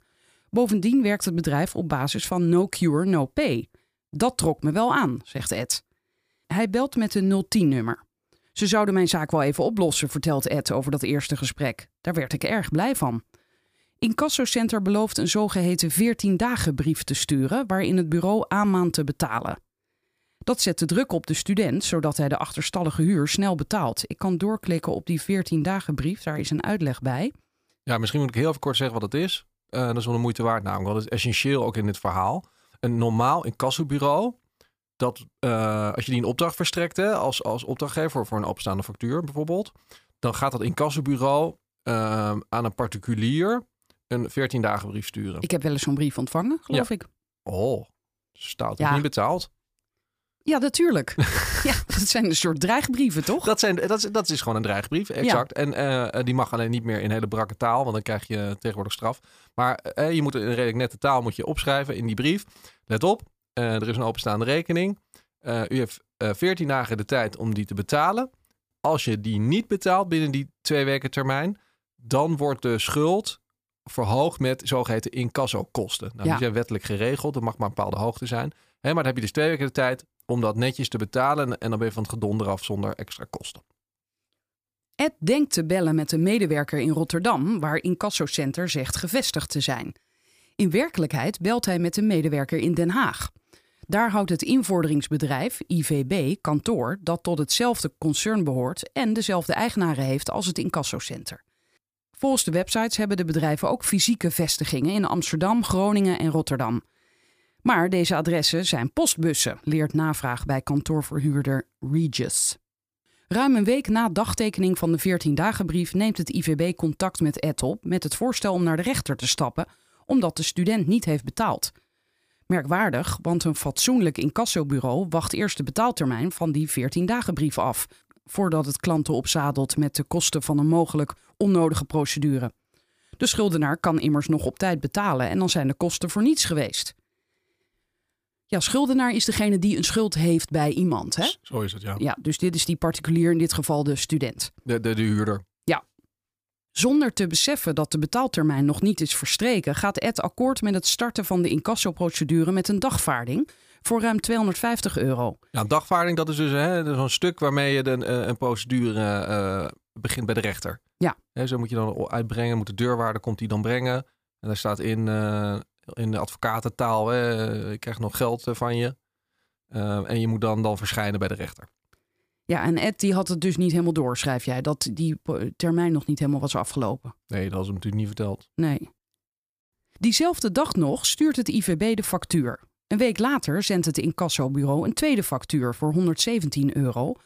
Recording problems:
none

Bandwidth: 15 kHz